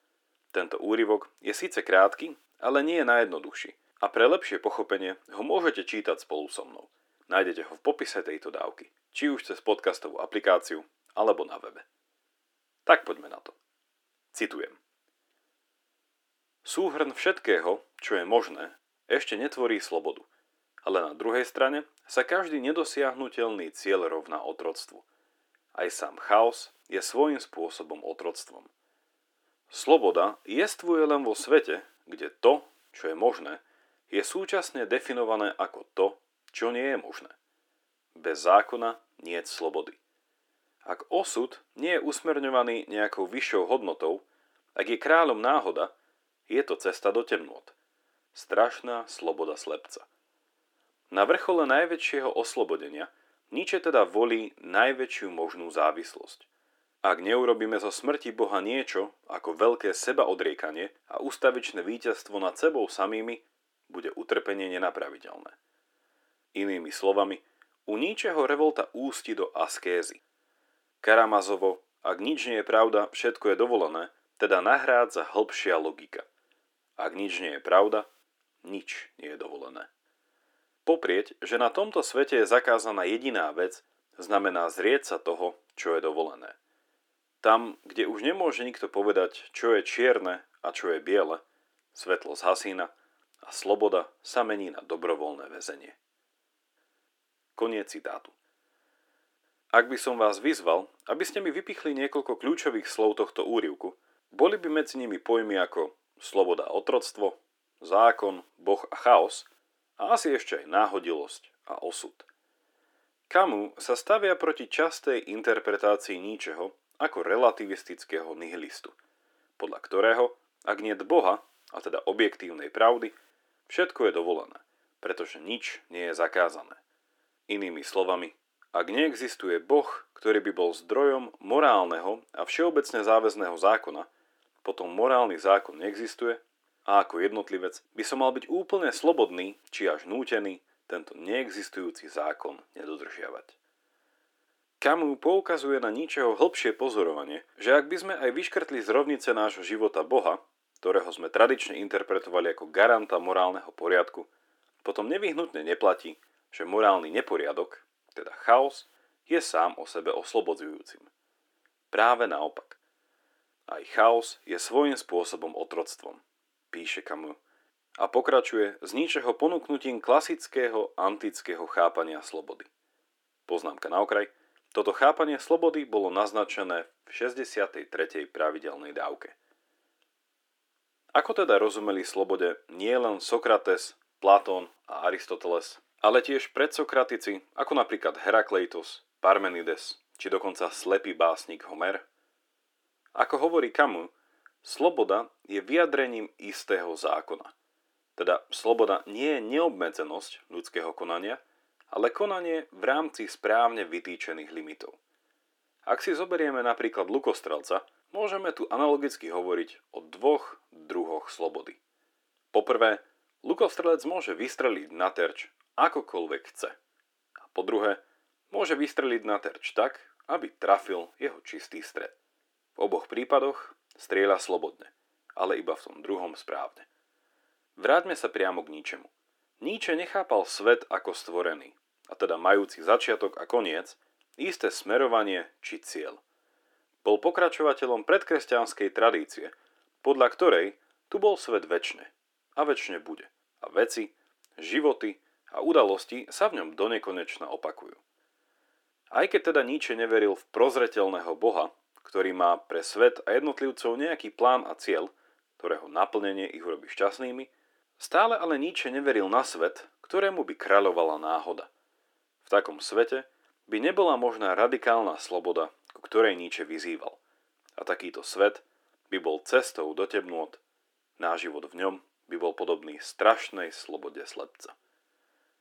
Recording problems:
thin; somewhat; fading below 300 Hz

